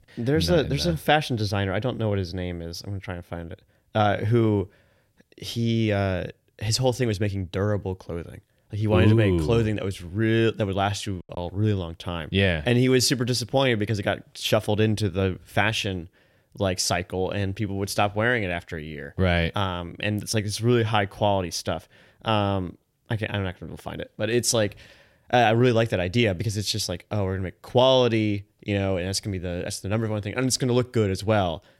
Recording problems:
choppy; occasionally; at 11 s; 3% of the speech affected

